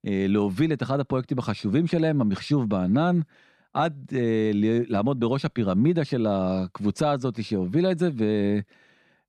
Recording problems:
none

